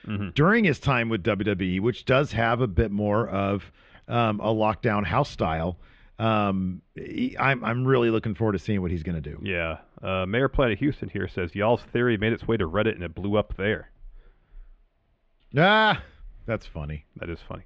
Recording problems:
muffled; very; fading above 3.5 kHz

